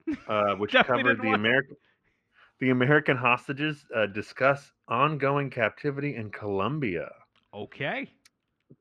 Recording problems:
muffled; slightly; fading above 3 kHz

